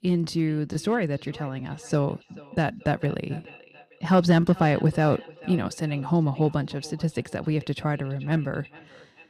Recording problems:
echo of what is said; faint; throughout; 440 ms later, 20 dB below the speech

